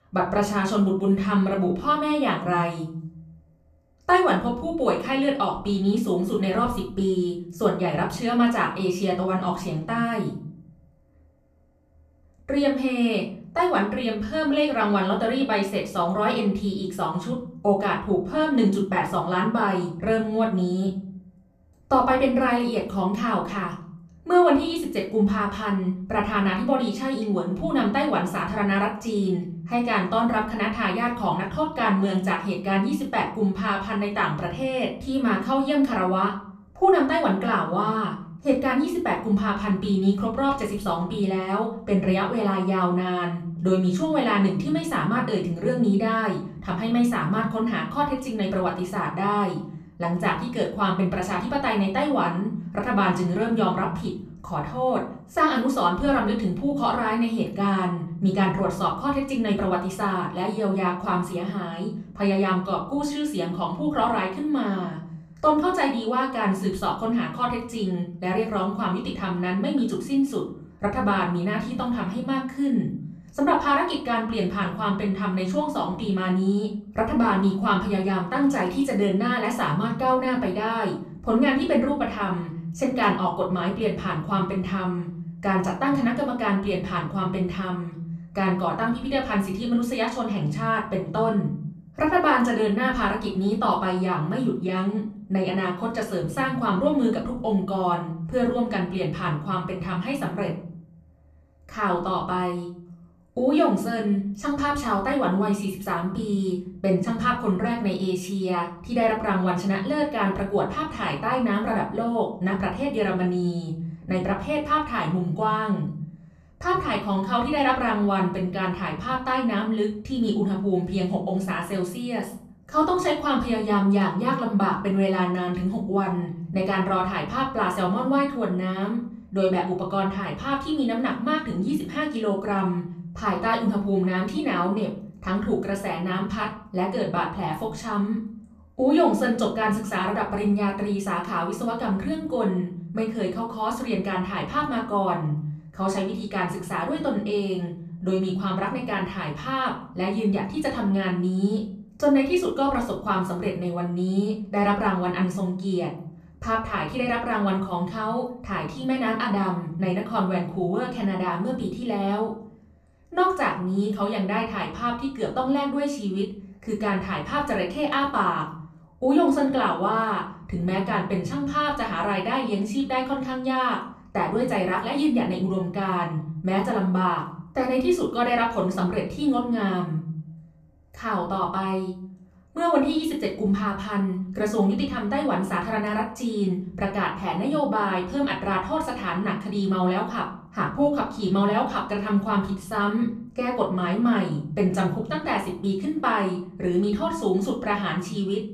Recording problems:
off-mic speech; far
room echo; slight; dies away in 0.5 s

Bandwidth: 14.5 kHz